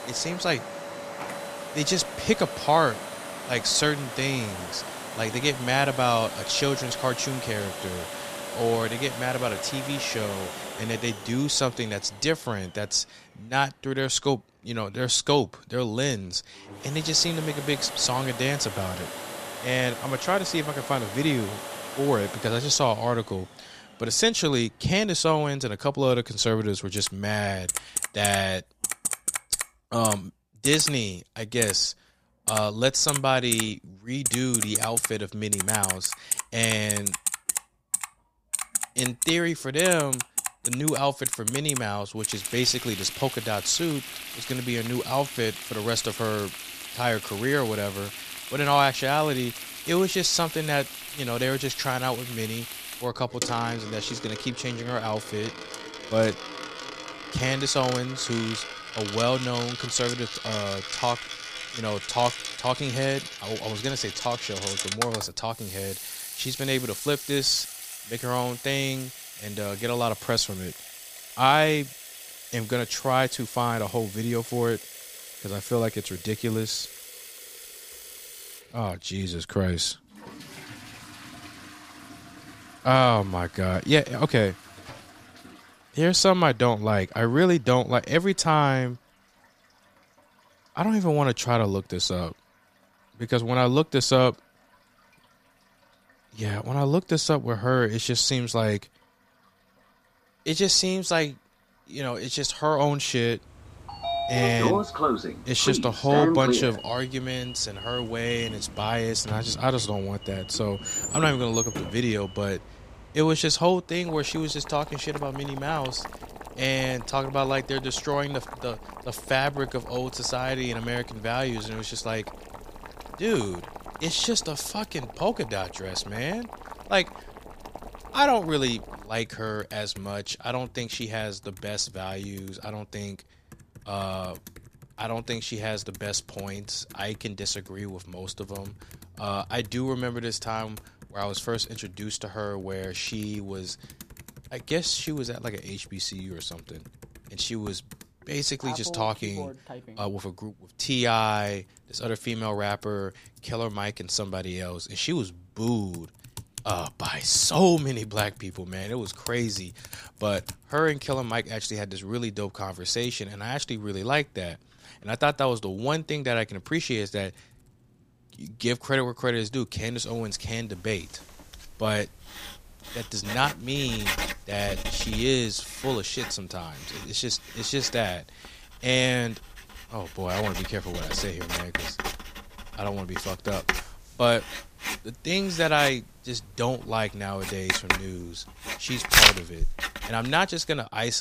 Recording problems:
household noises; loud; throughout; 5 dB below the speech
abrupt cut into speech; at the end

